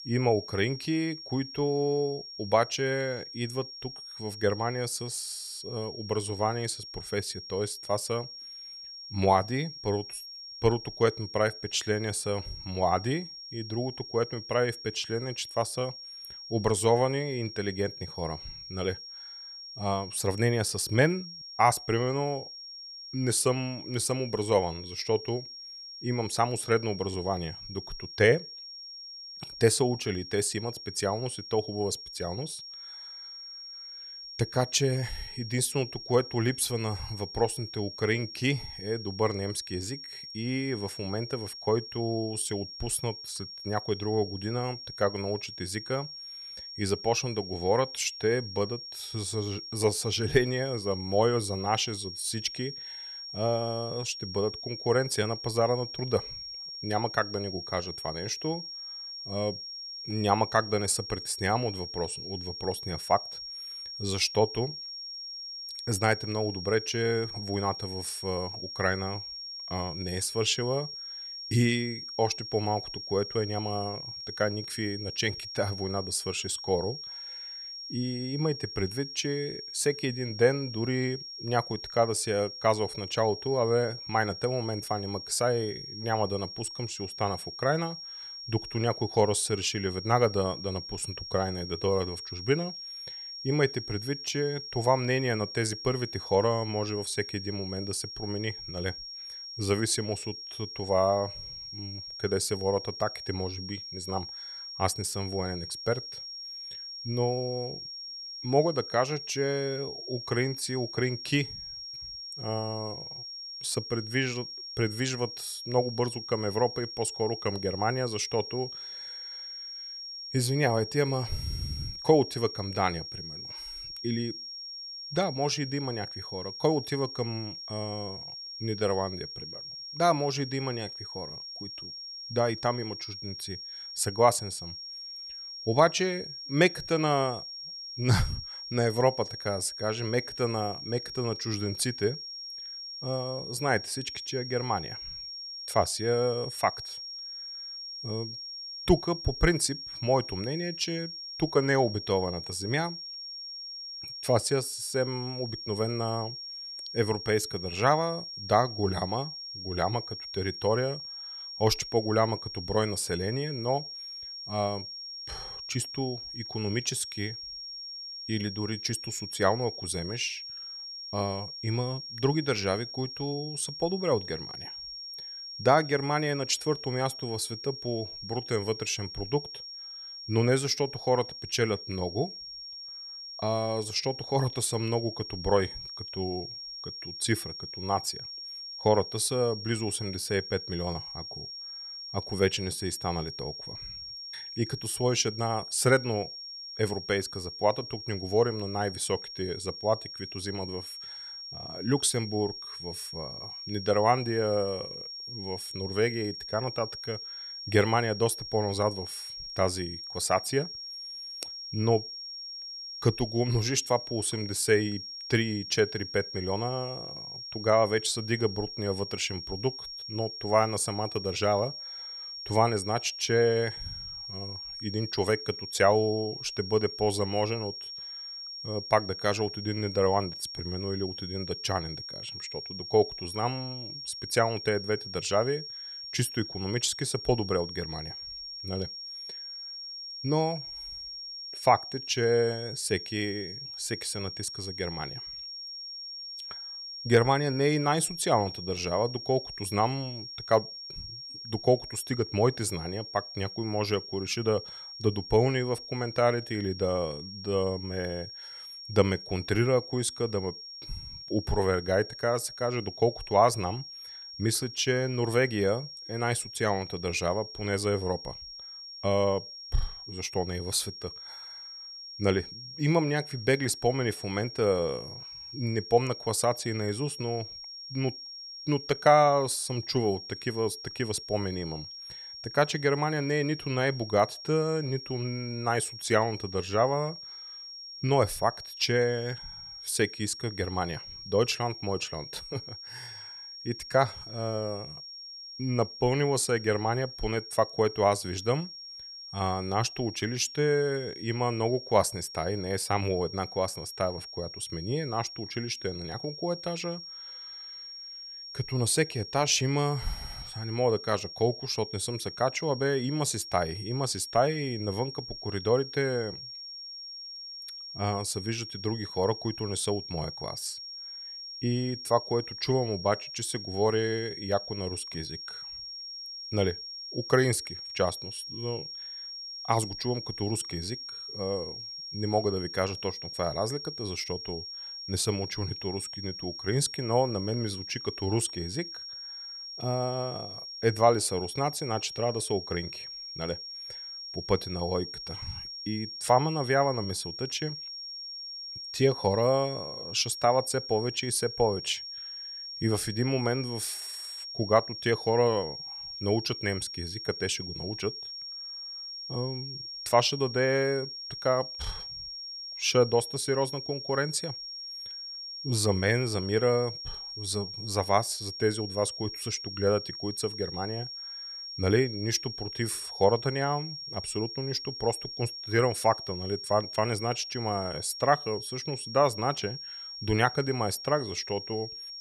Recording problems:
high-pitched whine; loud; throughout; 5.5 kHz, 9 dB below the speech

